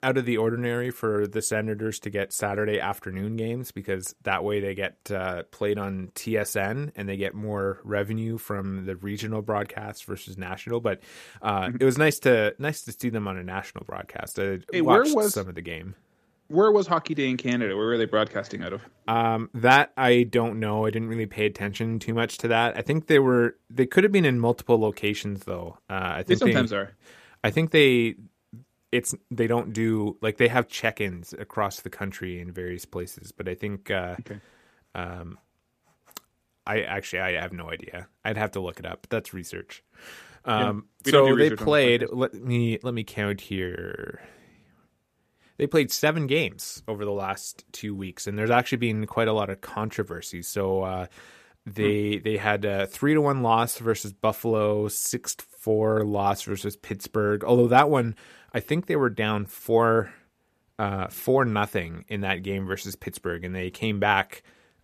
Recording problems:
none

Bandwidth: 14.5 kHz